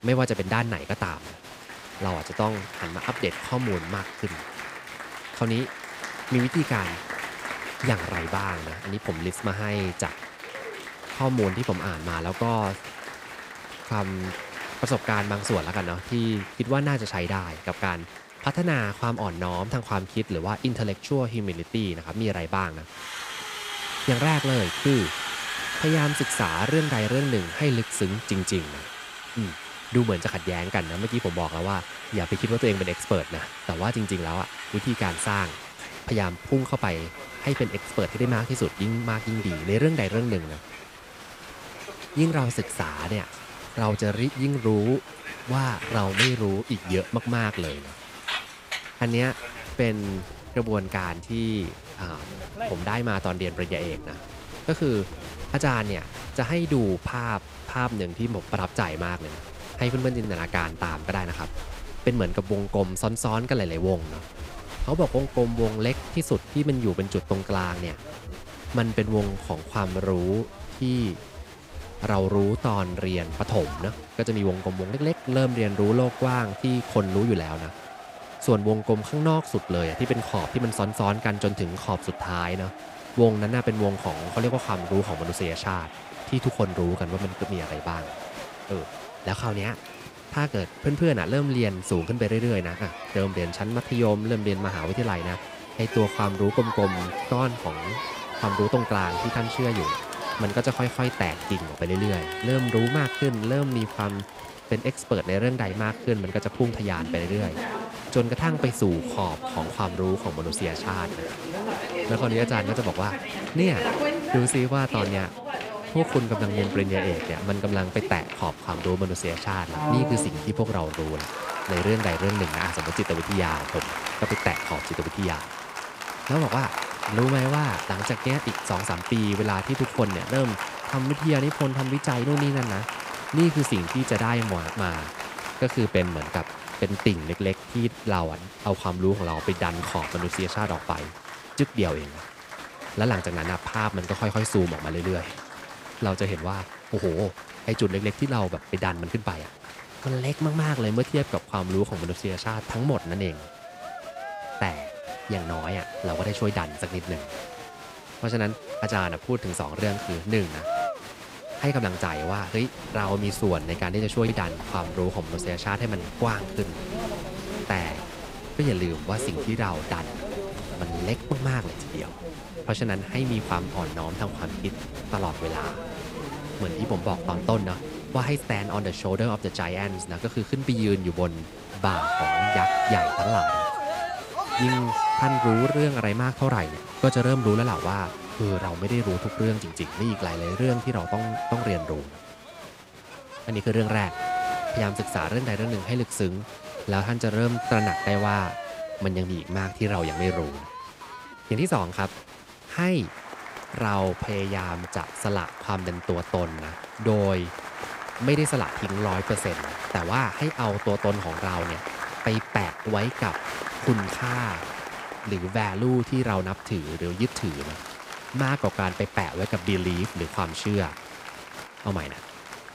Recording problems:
crowd noise; loud; throughout; 7 dB below the speech

